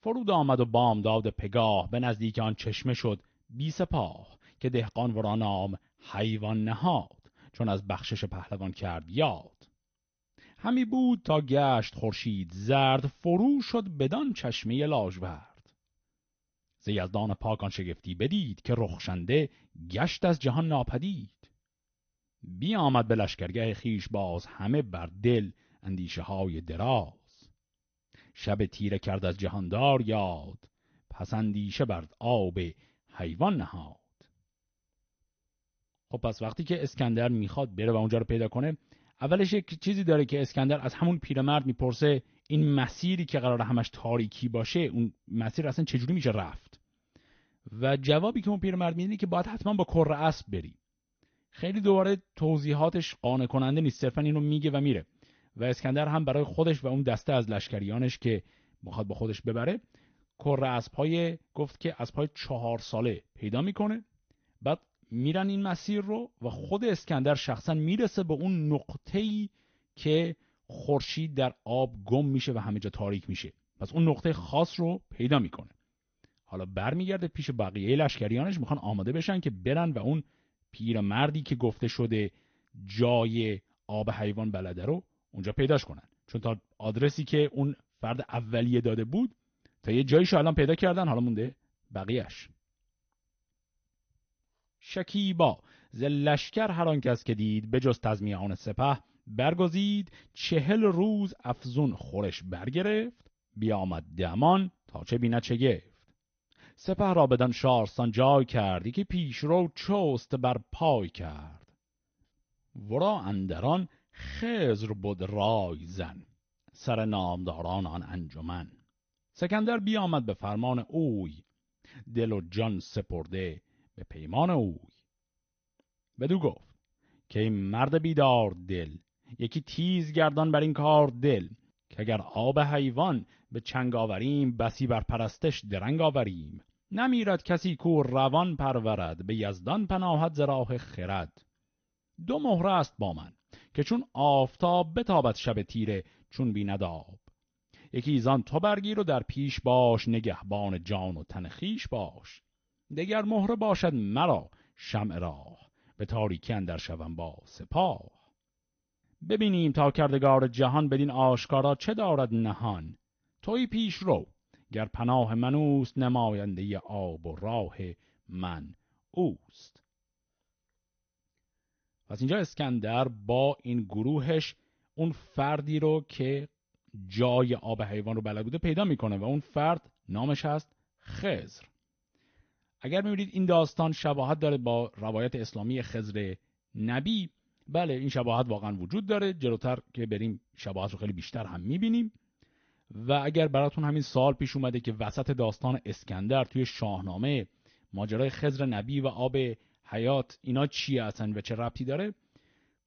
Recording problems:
garbled, watery; slightly; nothing above 6.5 kHz

